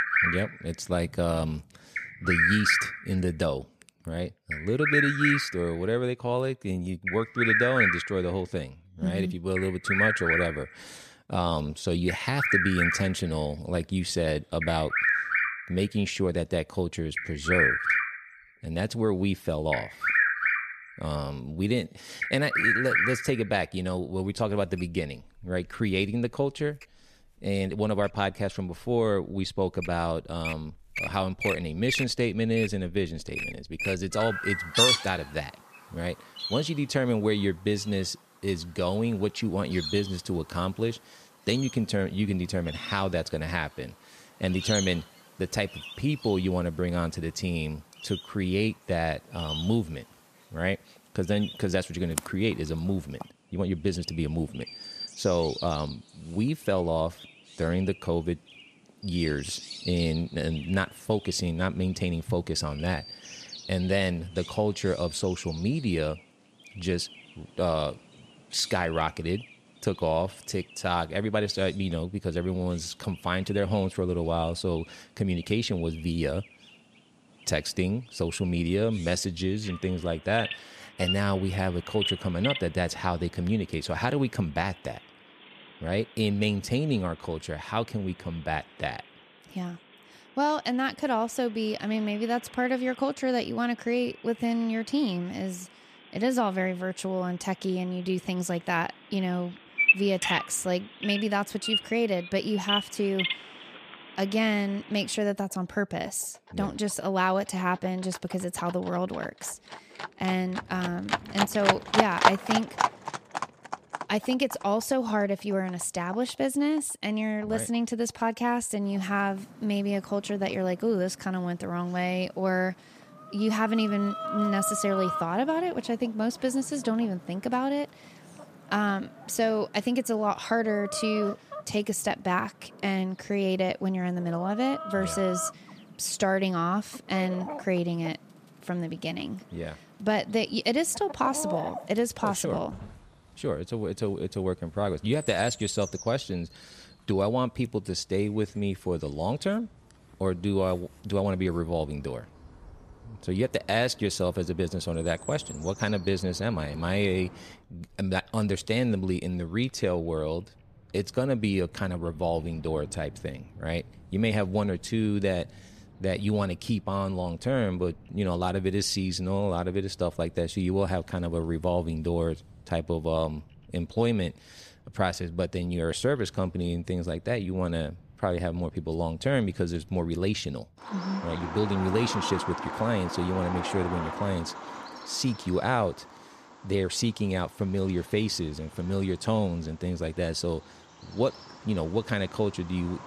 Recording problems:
animal sounds; loud; throughout; 1 dB below the speech

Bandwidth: 14.5 kHz